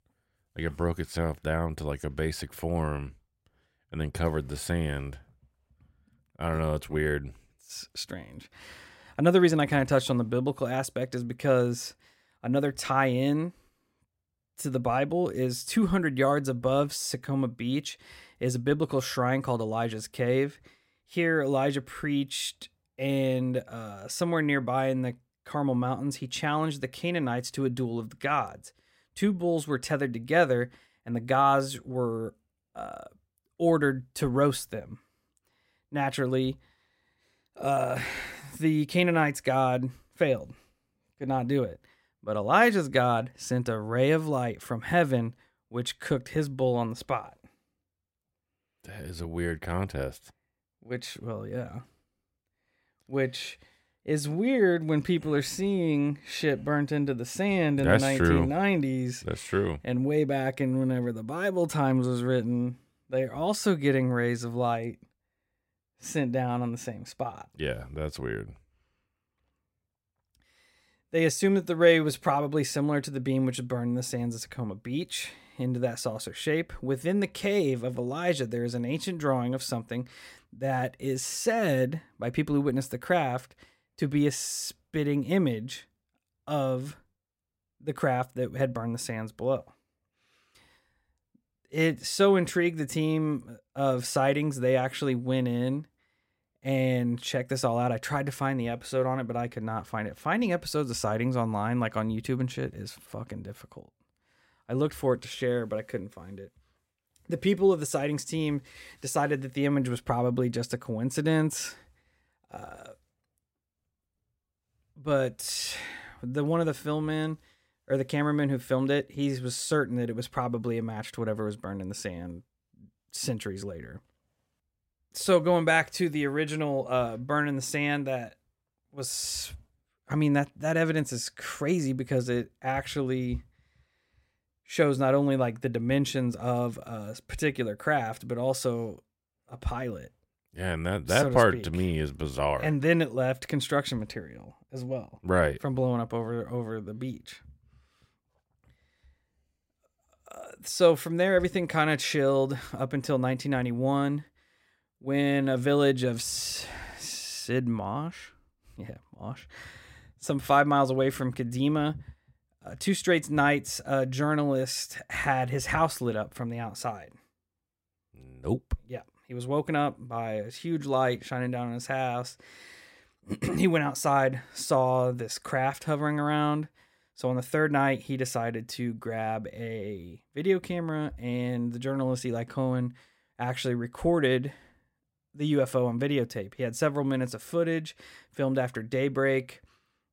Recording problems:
none

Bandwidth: 16 kHz